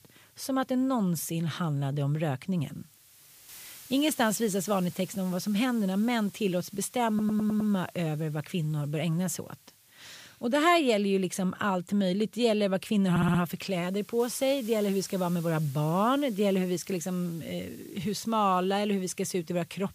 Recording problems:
hiss; faint; throughout; 20 dB below the speech
audio stuttering; at 7 s and at 13 s

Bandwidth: 15 kHz